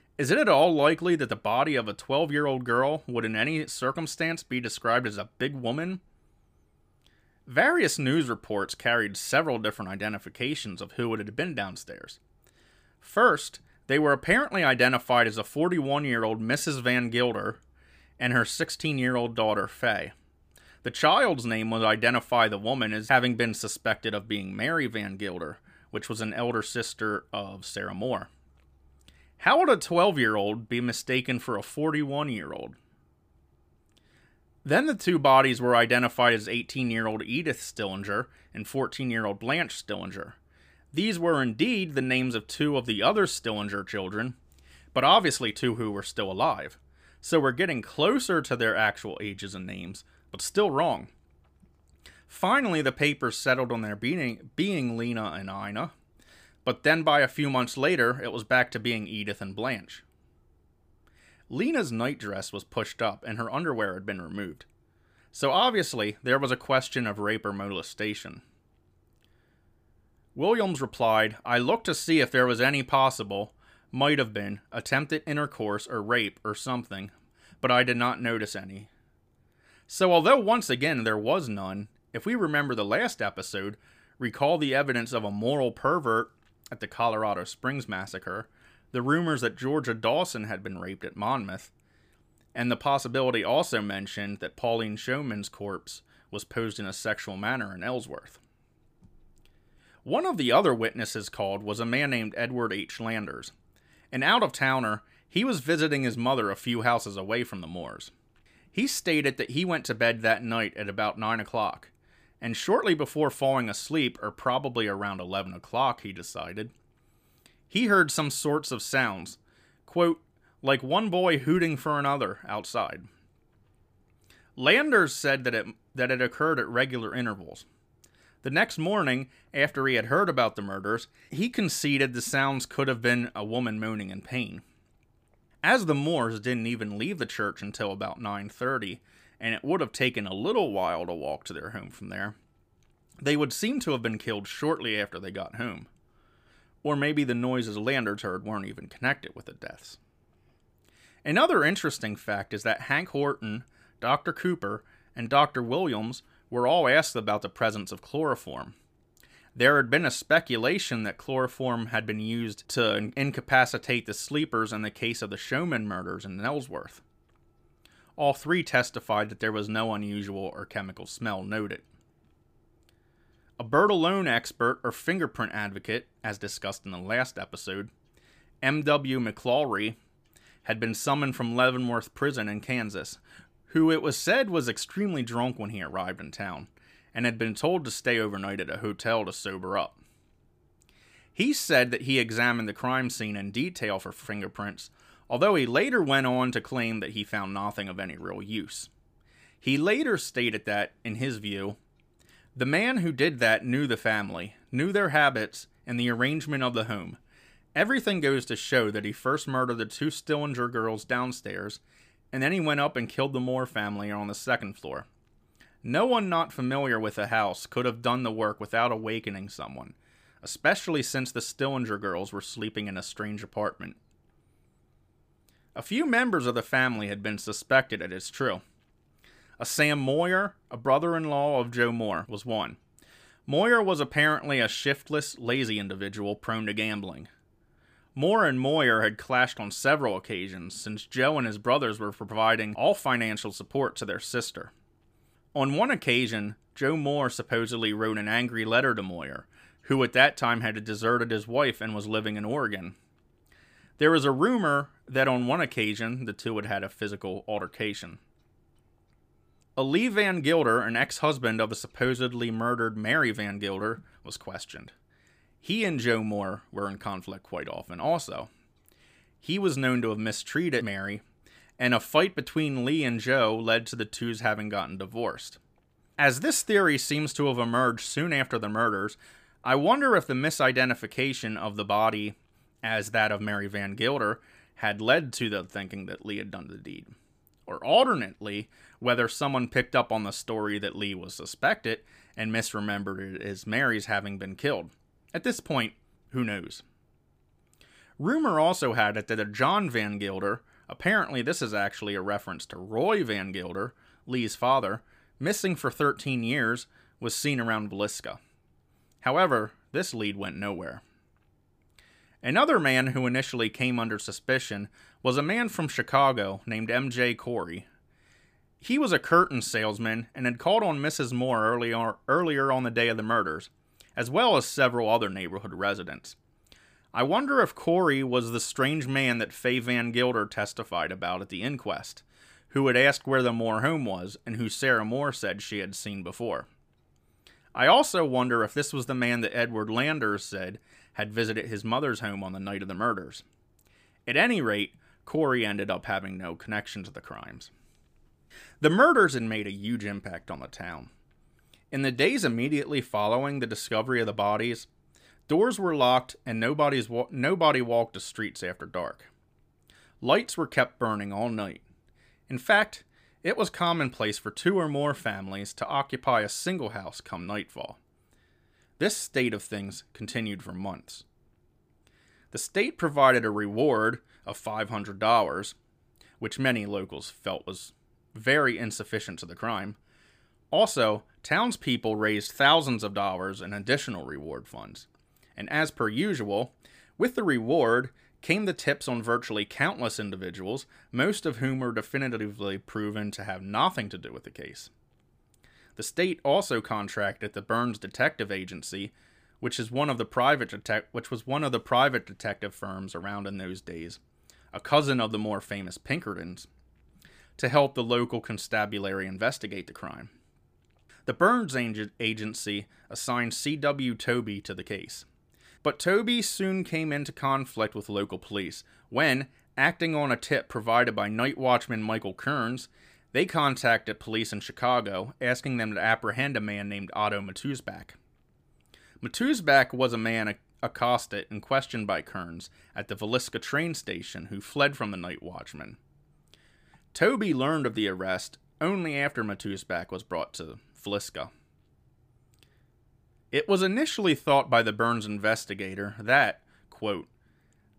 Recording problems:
none

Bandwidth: 15 kHz